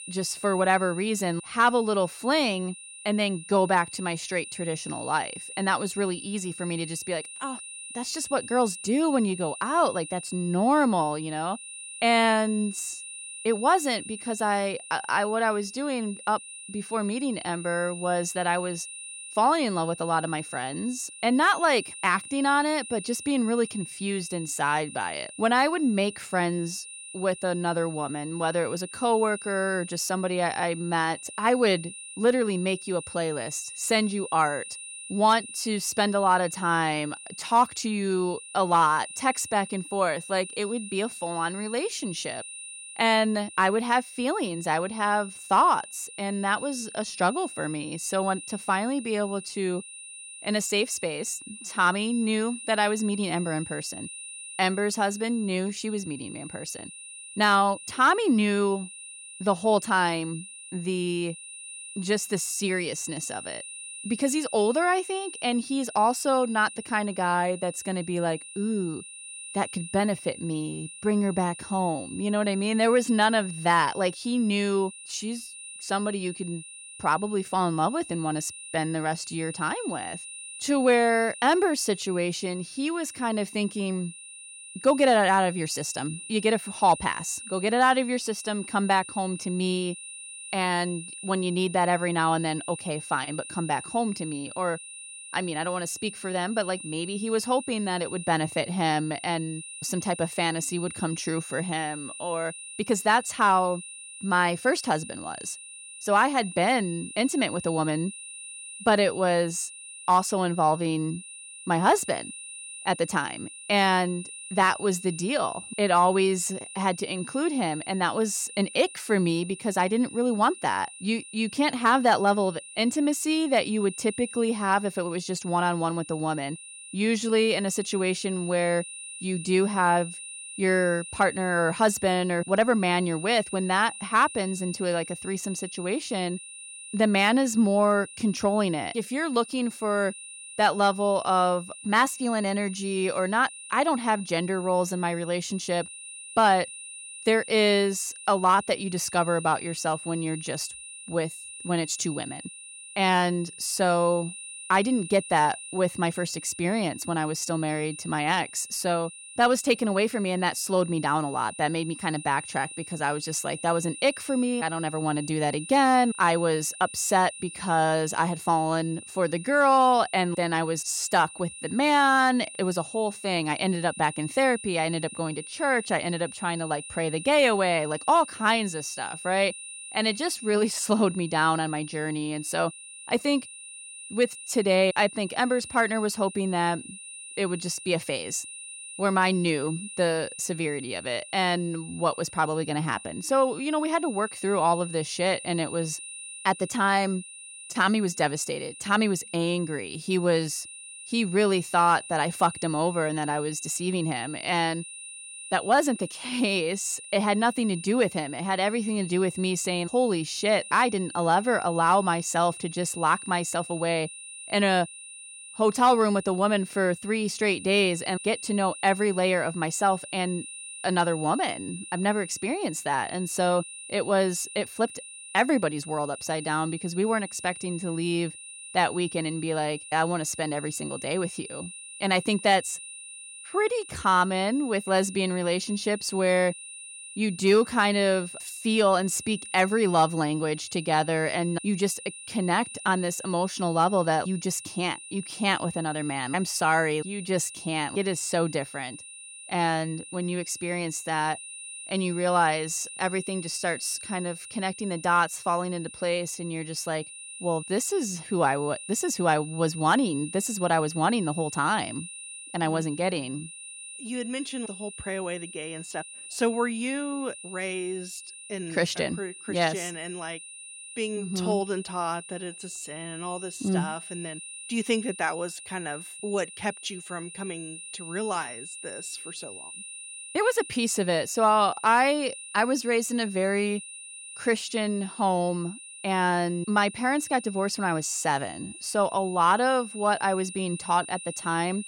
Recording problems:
high-pitched whine; noticeable; throughout; 9.5 kHz, 15 dB below the speech

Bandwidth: 17.5 kHz